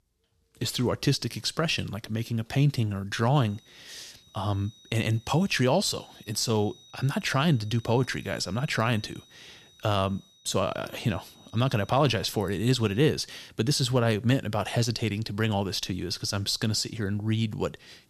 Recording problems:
high-pitched whine; faint; from 3.5 to 13 s; 4 kHz, 25 dB below the speech

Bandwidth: 13.5 kHz